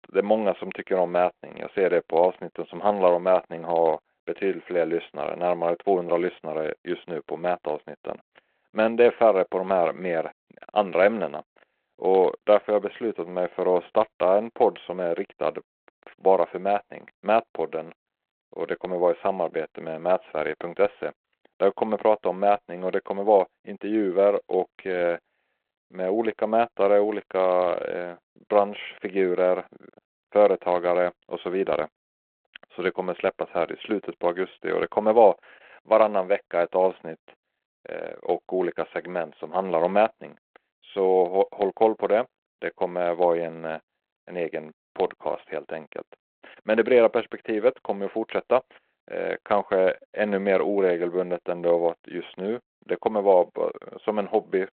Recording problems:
phone-call audio; nothing above 4 kHz

